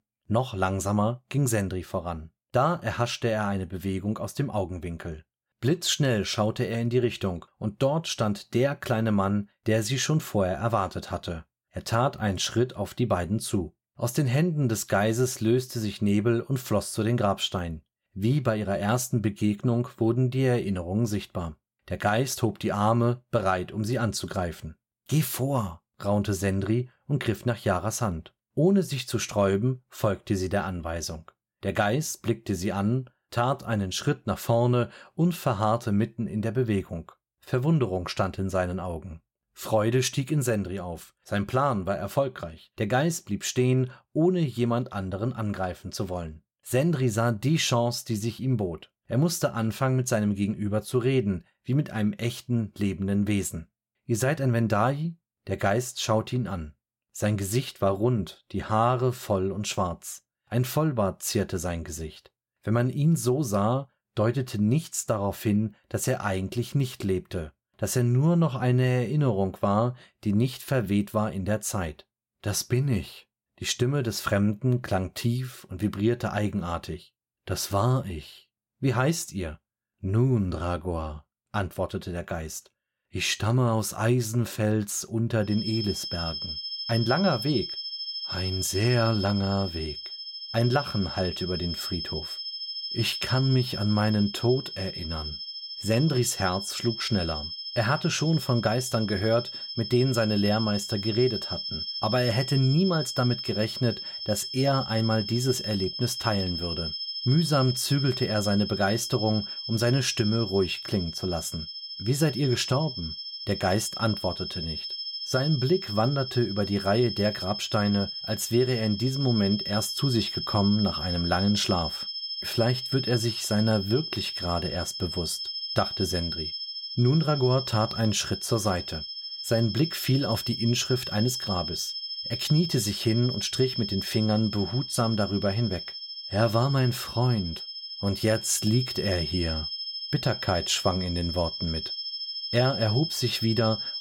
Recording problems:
high-pitched whine; loud; from 1:26 on; 5 kHz, 5 dB below the speech

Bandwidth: 16.5 kHz